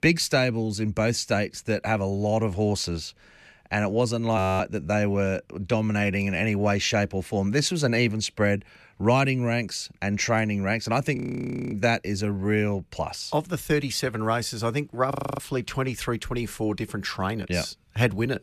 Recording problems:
audio freezing; at 4.5 s, at 11 s for 0.5 s and at 15 s

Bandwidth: 13.5 kHz